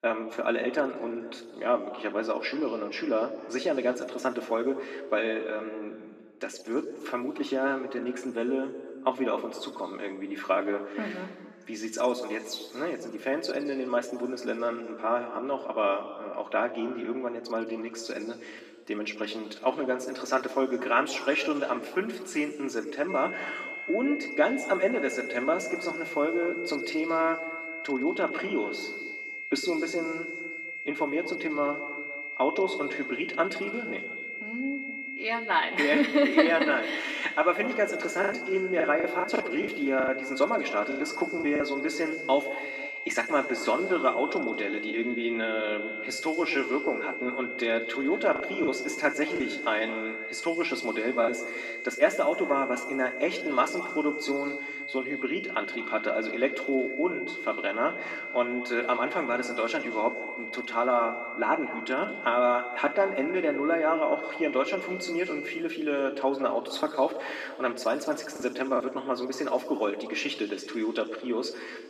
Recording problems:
off-mic speech; far
thin; somewhat; fading below 300 Hz
room echo; slight; dies away in 1.8 s
high-pitched whine; loud; from 23 s to 1:06; 2 kHz, 7 dB below the speech
choppy; very; from 38 to 42 s, from 49 to 51 s and at 1:08; 8% of the speech affected

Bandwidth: 14.5 kHz